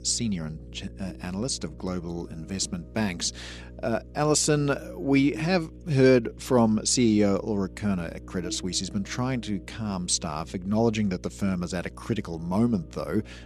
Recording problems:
electrical hum; faint; throughout; 60 Hz, 20 dB below the speech

